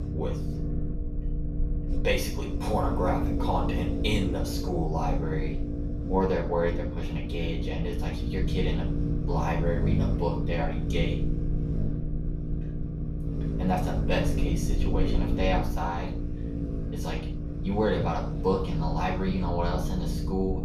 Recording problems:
off-mic speech; far
room echo; noticeable; dies away in 0.4 s
low rumble; loud; throughout; 7 dB below the speech

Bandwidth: 14.5 kHz